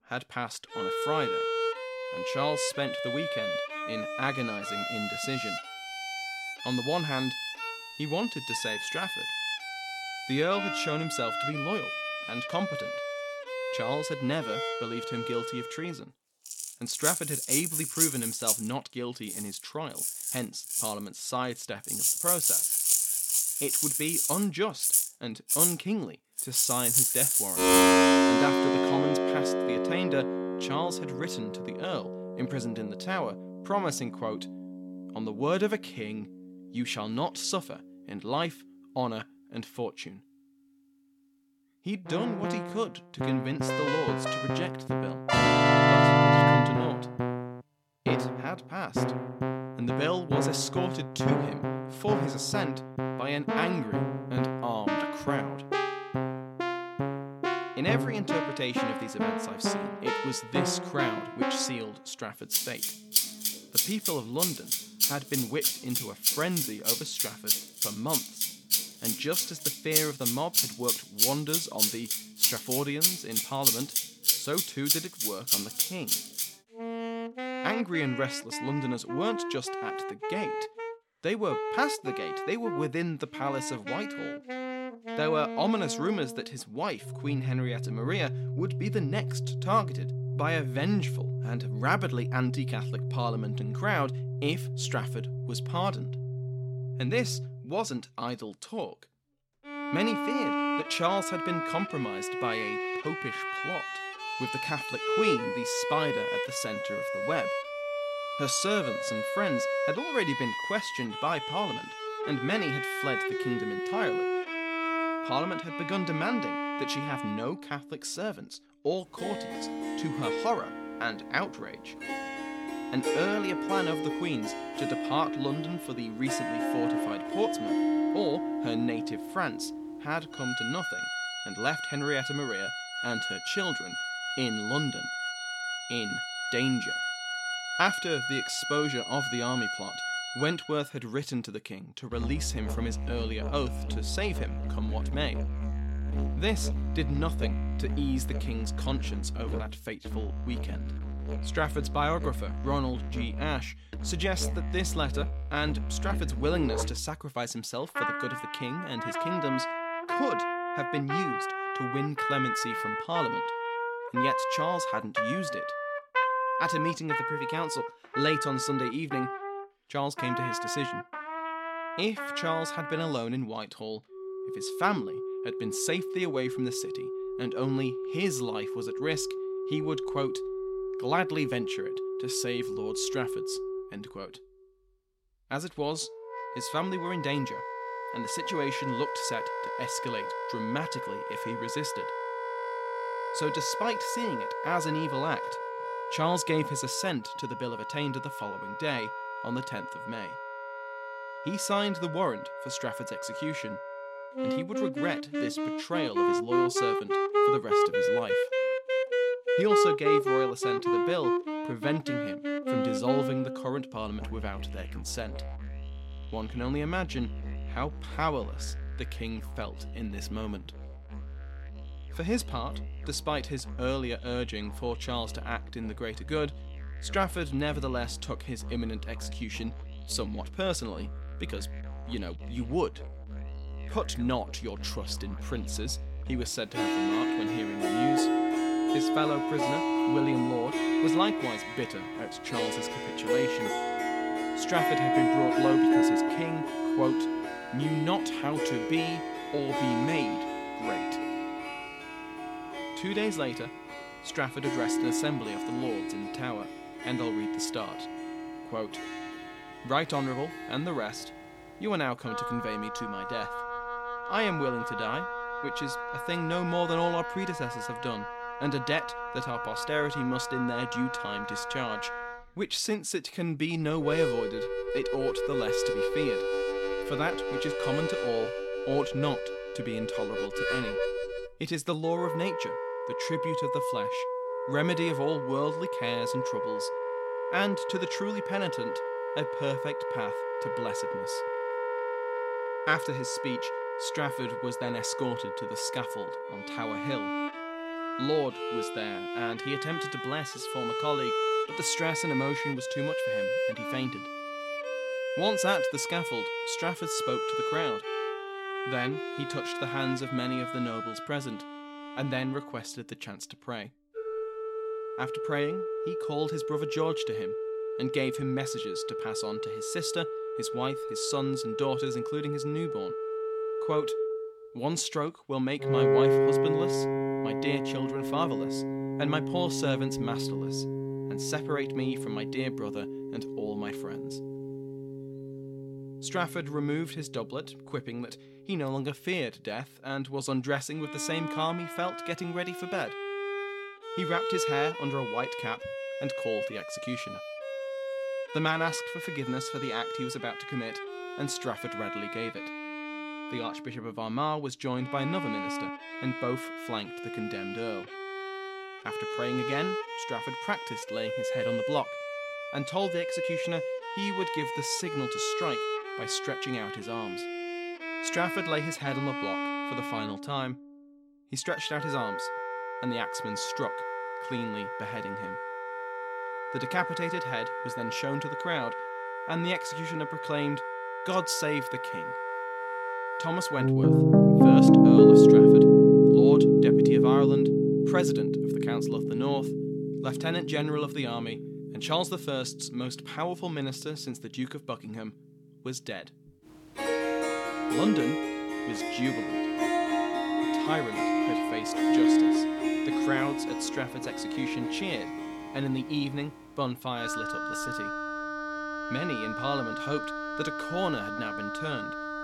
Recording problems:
background music; very loud; throughout; 3 dB above the speech

